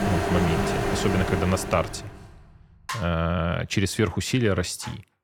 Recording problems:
household noises; loud; until 1.5 s; 2 dB below the speech

